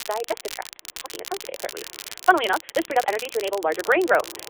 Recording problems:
wrong speed, natural pitch; too fast; 1.7 times normal speed
phone-call audio; nothing above 3.5 kHz
muffled; very slightly; fading above 3 kHz
crackle, like an old record; noticeable; 15 dB below the speech
rain or running water; faint; throughout; 30 dB below the speech

